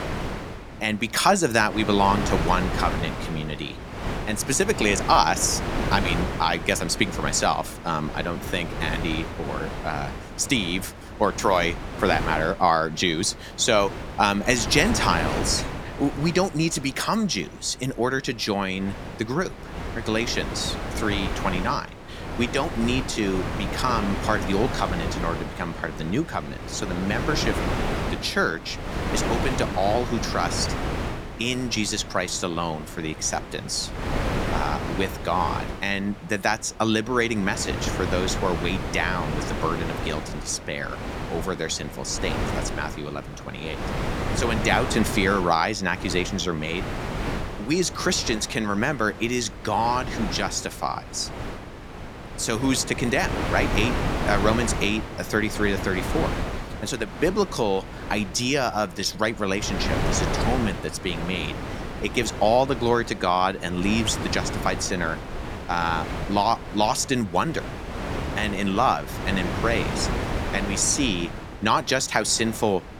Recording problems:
wind noise on the microphone; heavy; 8 dB below the speech

